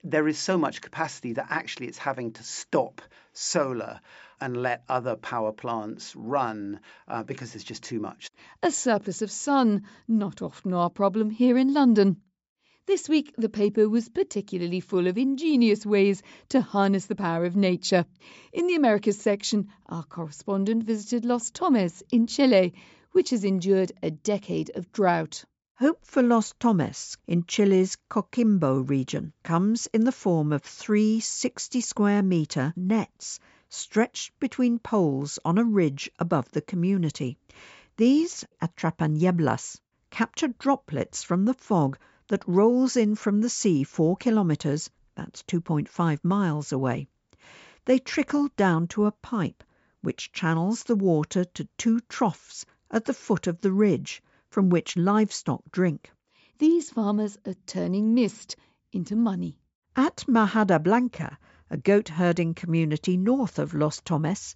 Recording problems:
high frequencies cut off; noticeable; nothing above 8 kHz

